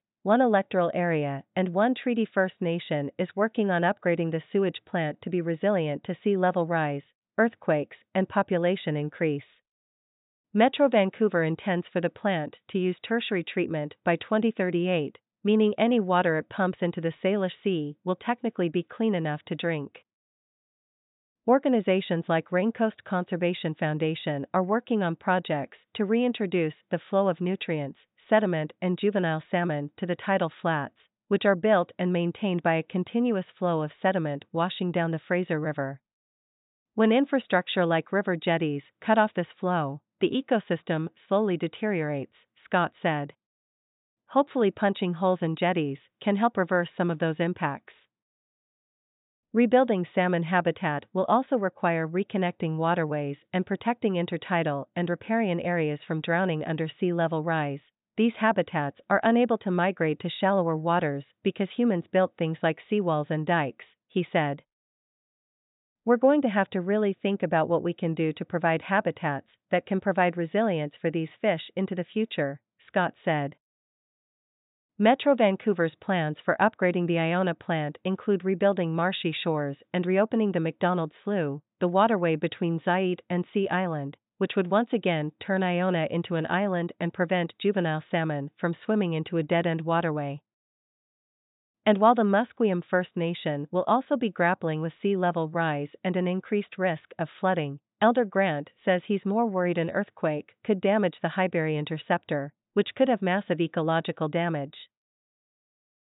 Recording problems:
high frequencies cut off; severe; nothing above 4 kHz

